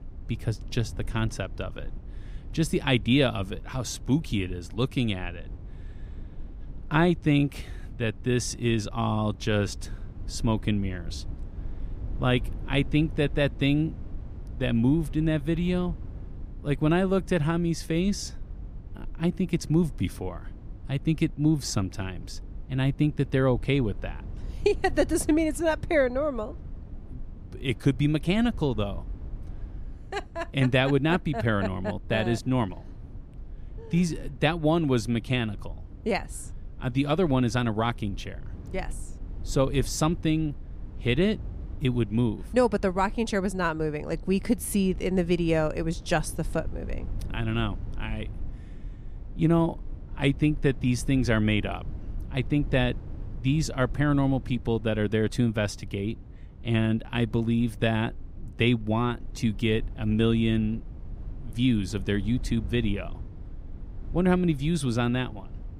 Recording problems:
low rumble; faint; throughout; 25 dB below the speech

